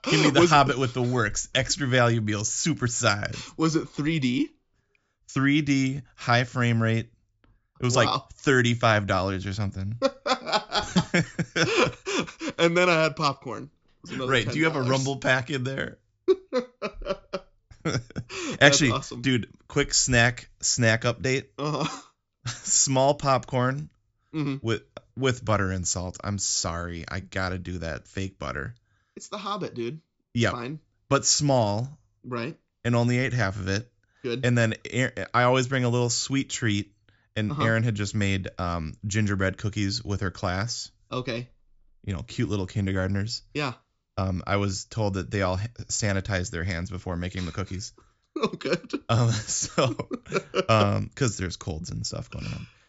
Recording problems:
high frequencies cut off; noticeable; nothing above 7.5 kHz

